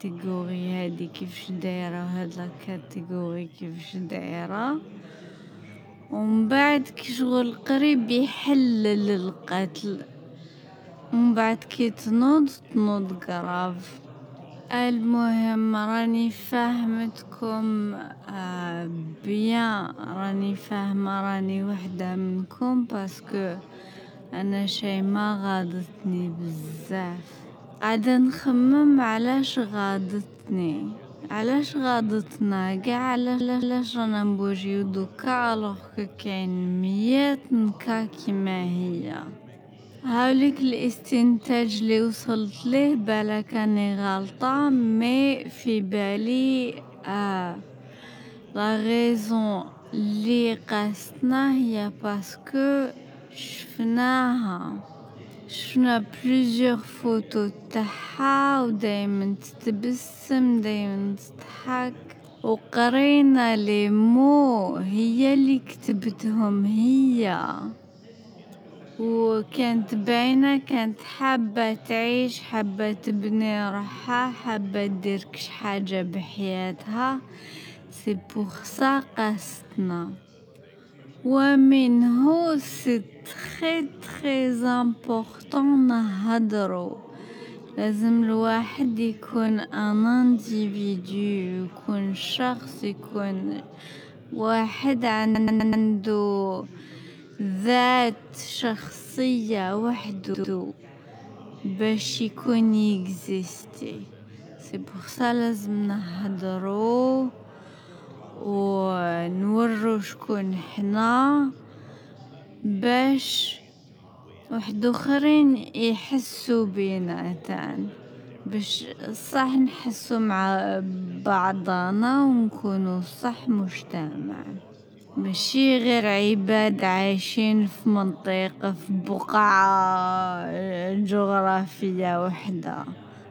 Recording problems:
wrong speed, natural pitch; too slow; 0.5 times normal speed
background chatter; faint; throughout; 4 voices, 20 dB below the speech
audio stuttering; at 33 s, at 1:35 and at 1:40

